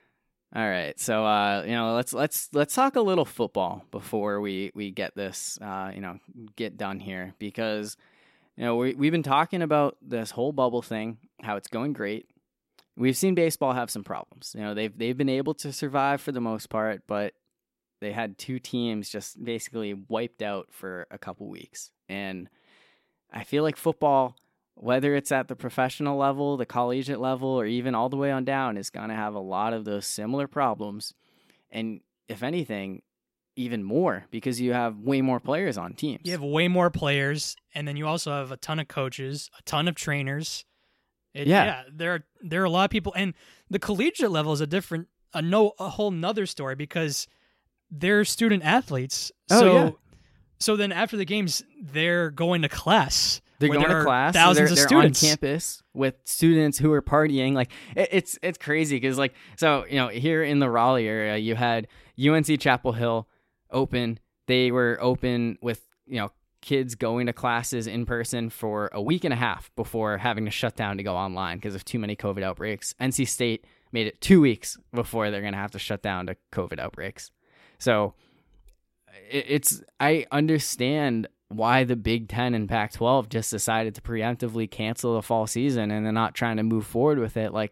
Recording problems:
none

